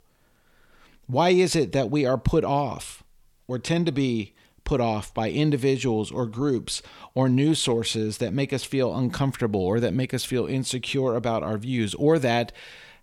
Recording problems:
none

